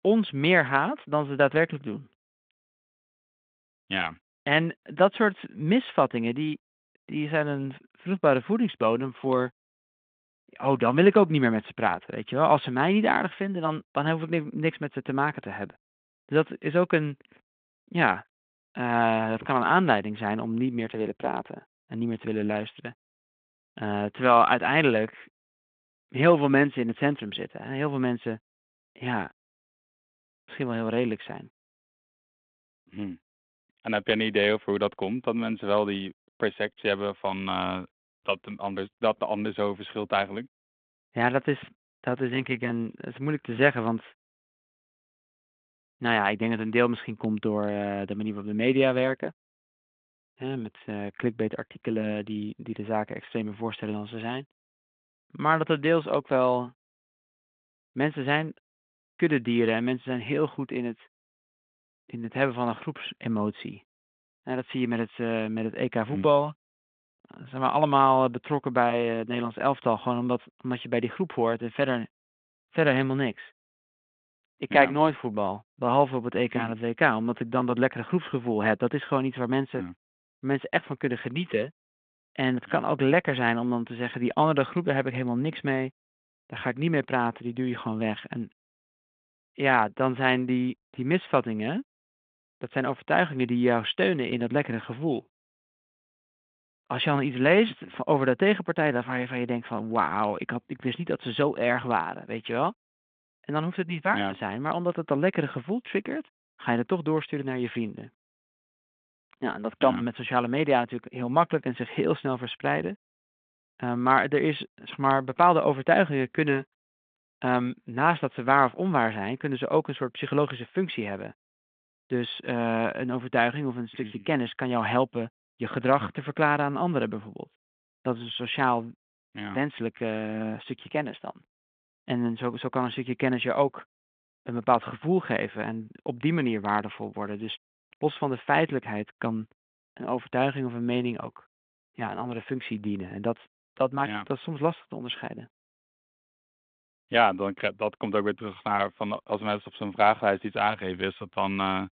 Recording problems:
phone-call audio

